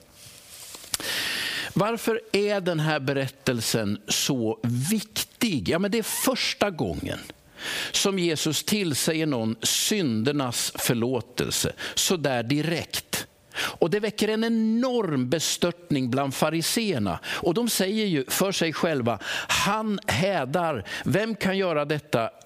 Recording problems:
squashed, flat; heavily

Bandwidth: 15 kHz